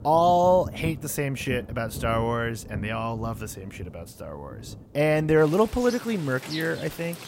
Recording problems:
rain or running water; noticeable; throughout; 15 dB below the speech

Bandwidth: 16 kHz